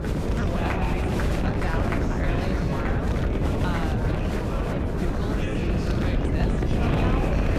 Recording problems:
echo of what is said; very faint; throughout; 100 ms later, 25 dB below the speech
chatter from many people; very loud; throughout; 4 dB above the speech
wind noise on the microphone; heavy; 4 dB above the speech

